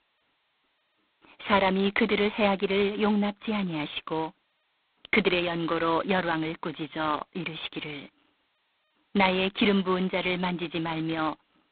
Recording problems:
phone-call audio; poor line; nothing above 4 kHz

